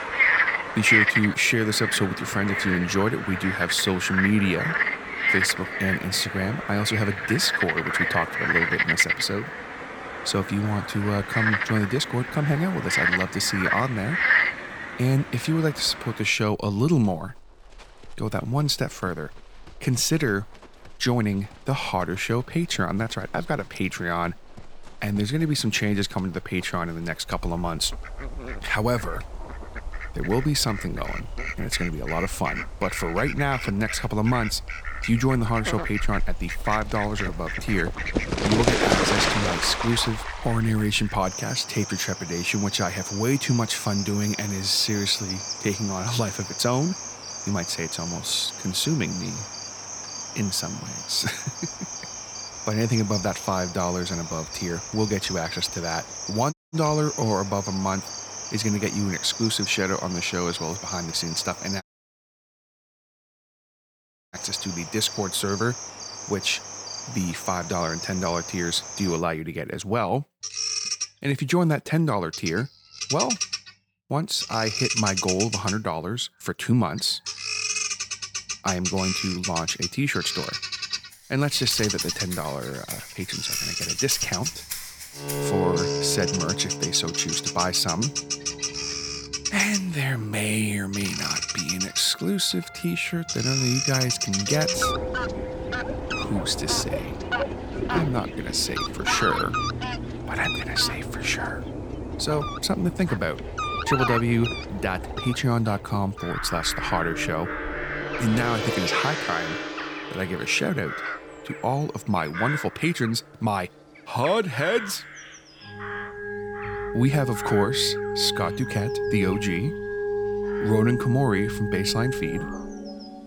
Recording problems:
animal sounds; loud; throughout; 3 dB below the speech
background music; loud; from 1:21 on; 7 dB below the speech
audio cutting out; at 57 s and at 1:02 for 2.5 s

